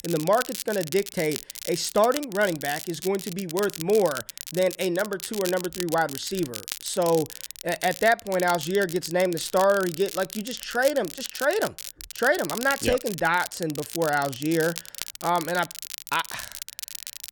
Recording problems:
crackle, like an old record; loud; 10 dB below the speech

